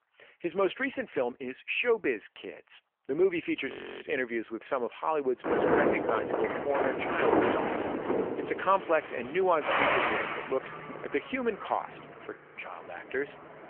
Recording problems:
phone-call audio; nothing above 3 kHz
traffic noise; very loud; from 5.5 s on; 1 dB above the speech
audio freezing; at 3.5 s and at 12 s

